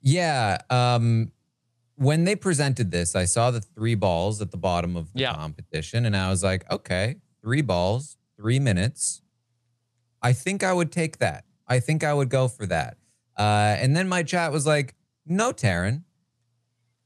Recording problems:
none

